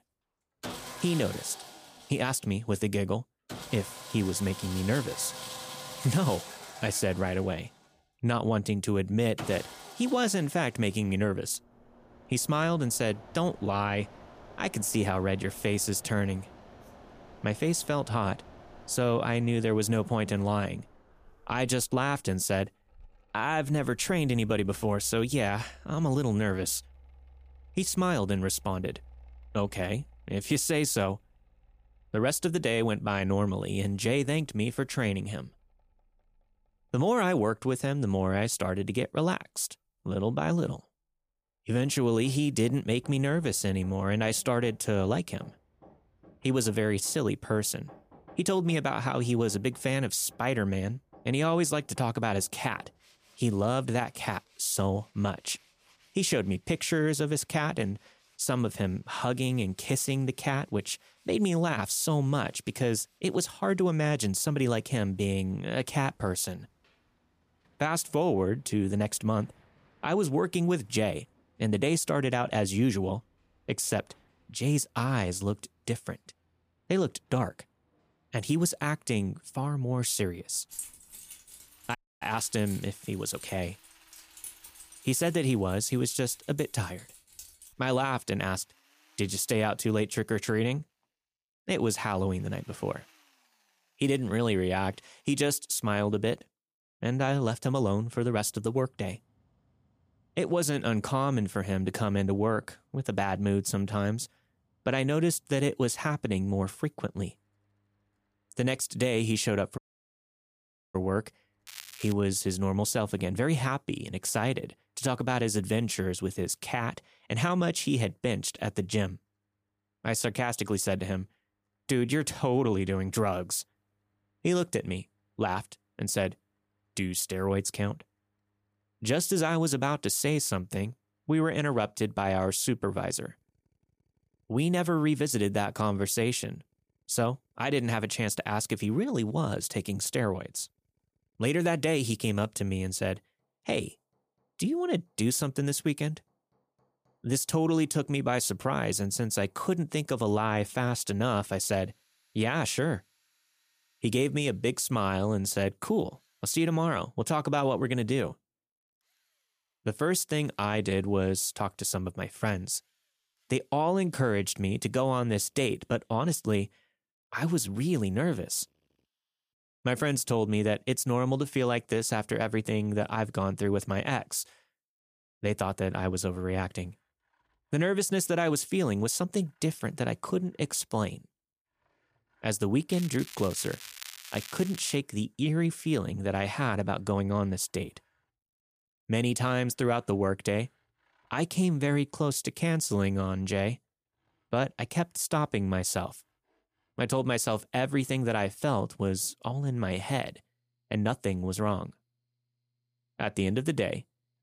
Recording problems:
crackling; noticeable; at 1:52 and from 3:03 to 3:05; 15 dB below the speech
machinery noise; faint; throughout; 20 dB below the speech
jangling keys; noticeable; from 1:21 to 1:28; peak 10 dB below the speech
audio cutting out; at 1:22 and at 1:50 for 1 s

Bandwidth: 15 kHz